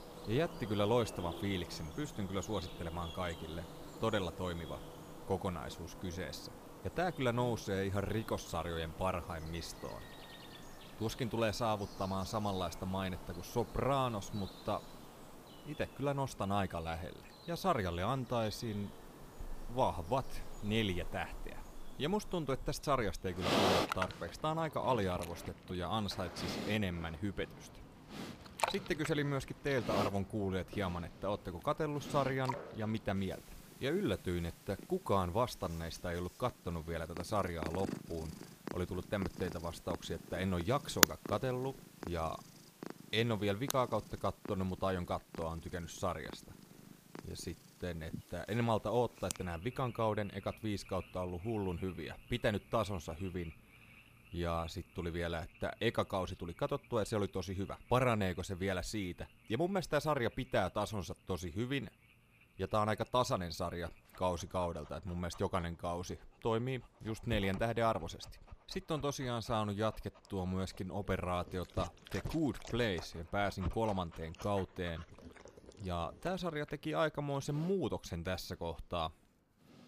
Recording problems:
animal sounds; loud; throughout; 7 dB below the speech

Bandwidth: 15 kHz